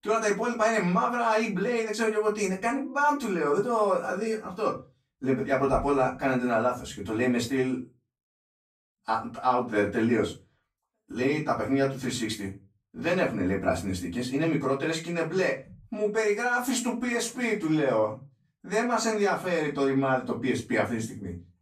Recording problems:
off-mic speech; far
room echo; slight; dies away in 0.2 s

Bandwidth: 14.5 kHz